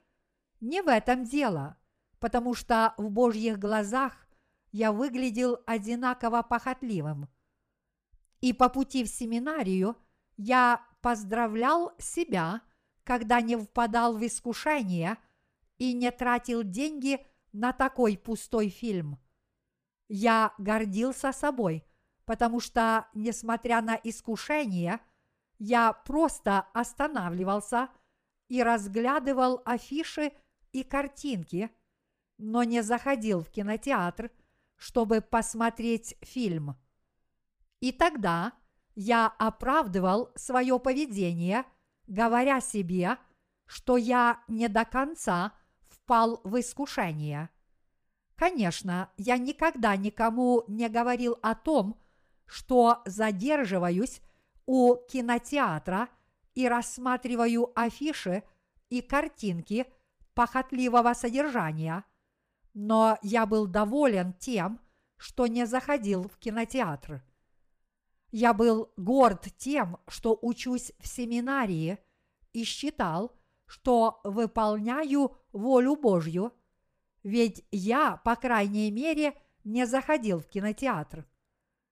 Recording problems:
none

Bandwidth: 15 kHz